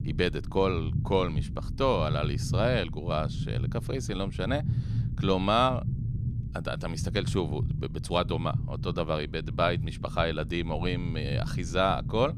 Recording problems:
low rumble; noticeable; throughout; 15 dB below the speech

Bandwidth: 14.5 kHz